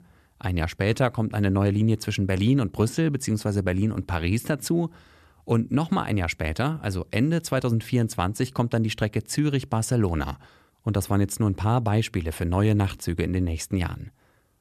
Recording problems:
none

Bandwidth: 13.5 kHz